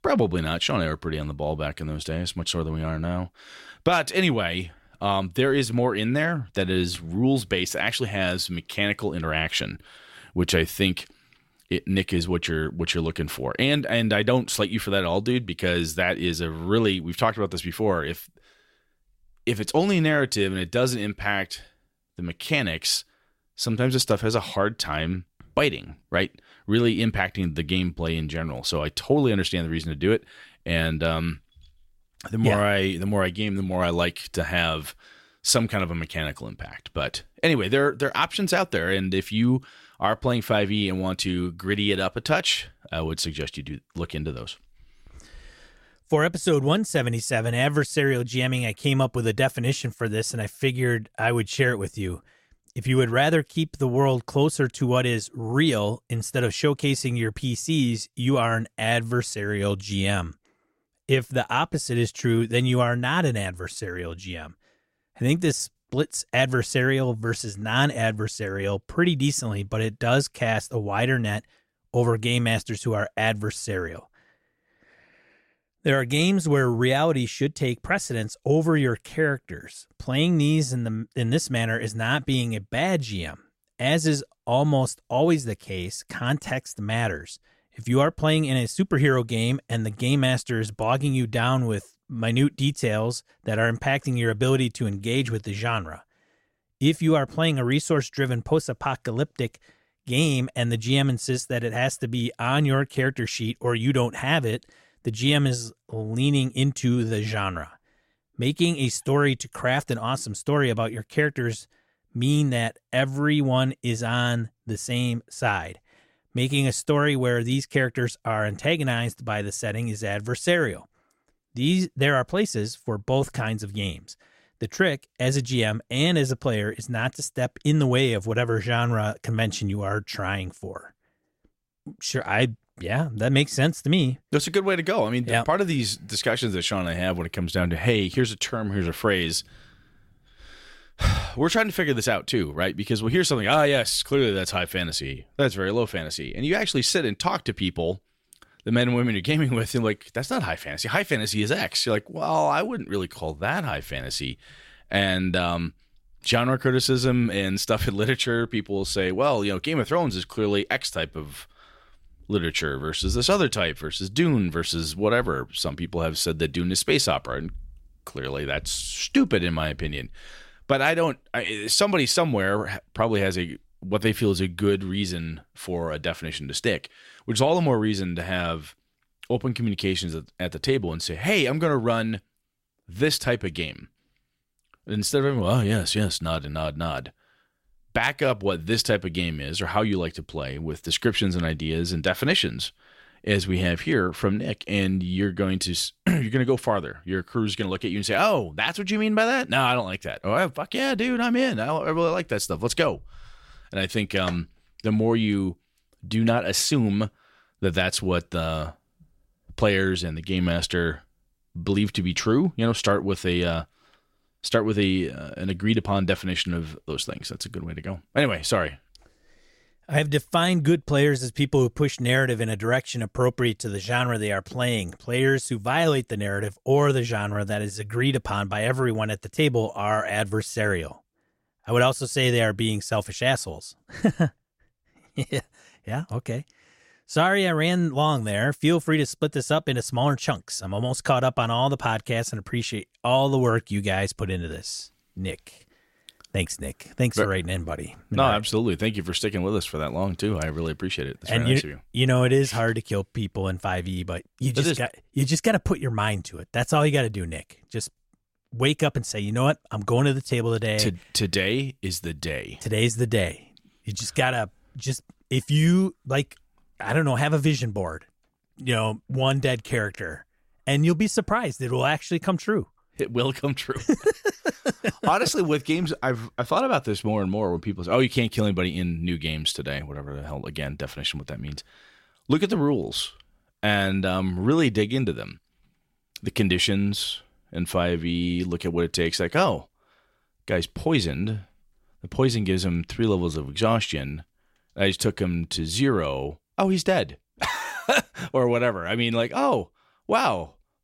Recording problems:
none

